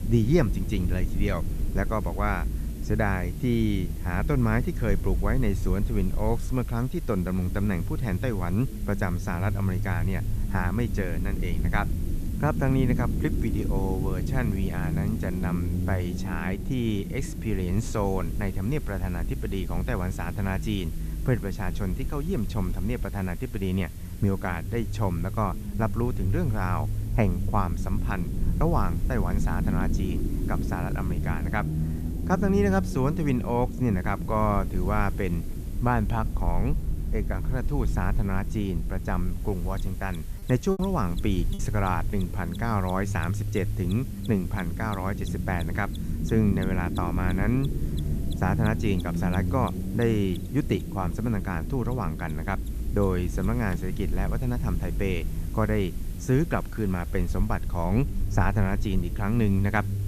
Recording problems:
low rumble; noticeable; throughout; 10 dB below the speech
machinery noise; faint; throughout; 25 dB below the speech
hiss; faint; throughout; 20 dB below the speech
choppy; very; at 41 s; 9% of the speech affected

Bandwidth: 14.5 kHz